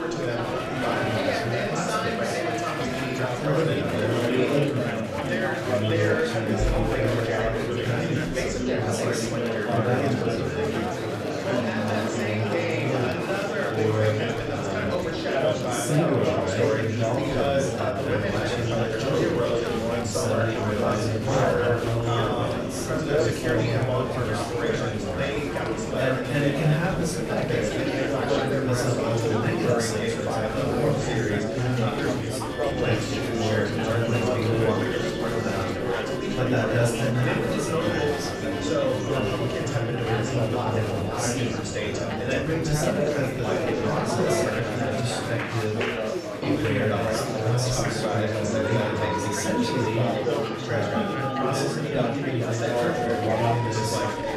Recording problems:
off-mic speech; far
room echo; noticeable; dies away in 0.5 s
chatter from many people; very loud; throughout; 3 dB above the speech
household noises; noticeable; throughout; 10 dB below the speech
background music; noticeable; throughout; 20 dB below the speech

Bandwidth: 14 kHz